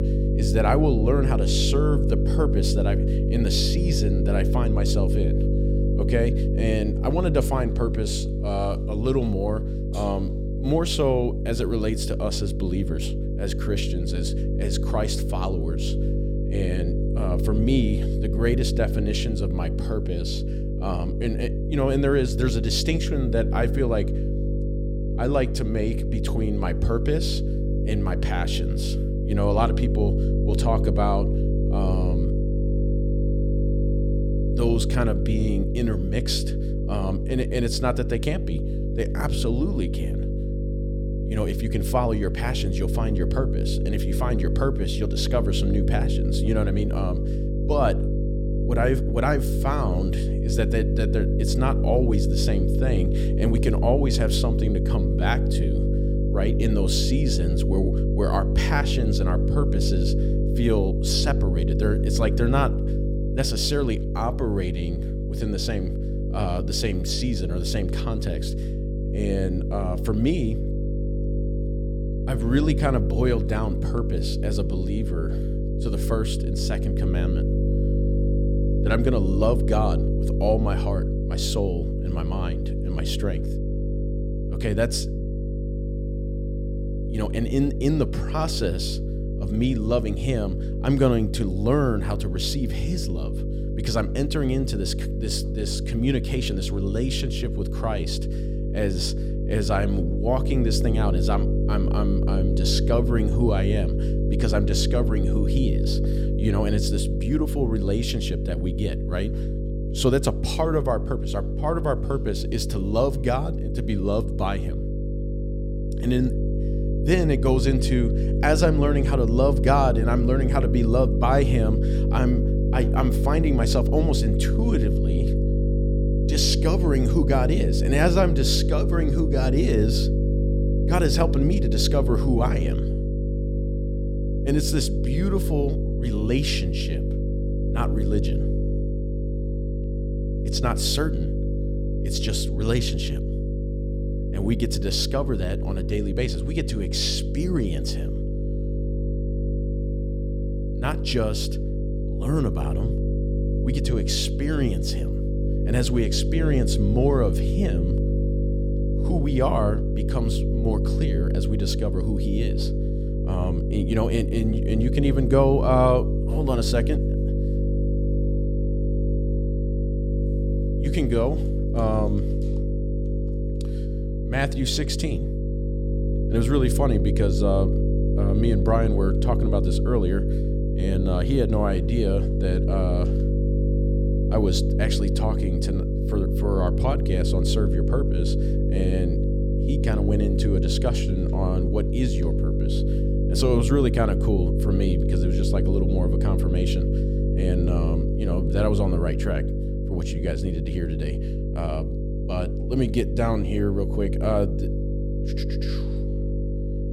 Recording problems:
electrical hum; loud; throughout; 50 Hz, 5 dB below the speech

